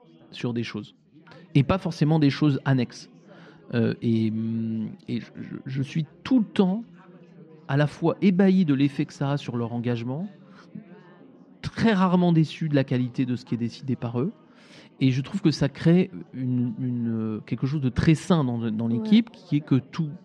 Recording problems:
muffled; slightly; fading above 3.5 kHz
chatter from many people; faint; throughout; 25 dB below the speech

